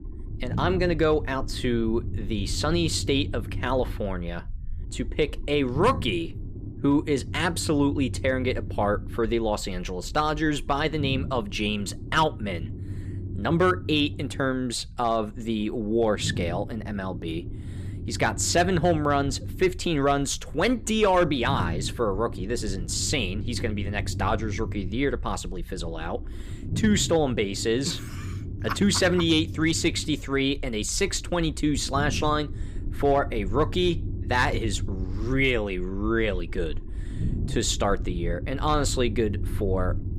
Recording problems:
low rumble; noticeable; throughout; 20 dB below the speech

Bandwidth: 15 kHz